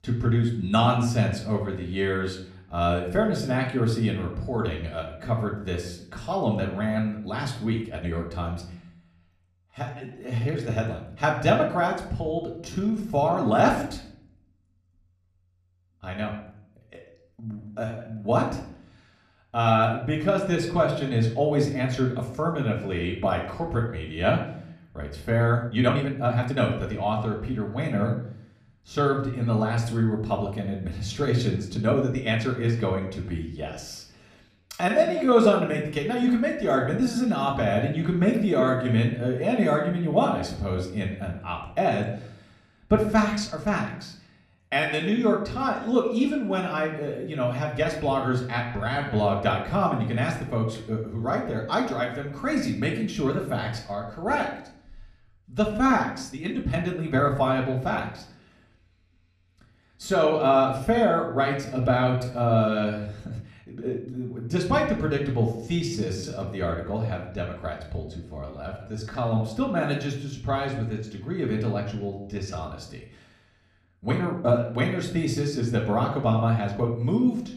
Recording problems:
room echo; slight; dies away in 0.6 s
off-mic speech; somewhat distant
uneven, jittery; strongly; from 8 s to 1:17

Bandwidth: 14 kHz